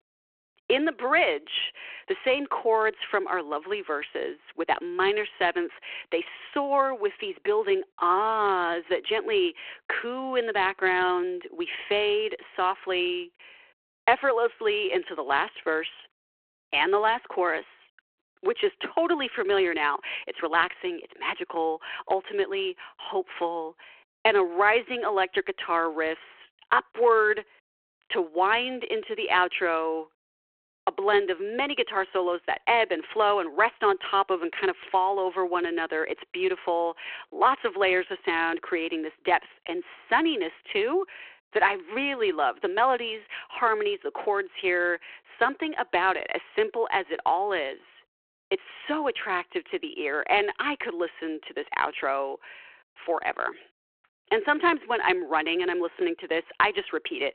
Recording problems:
phone-call audio

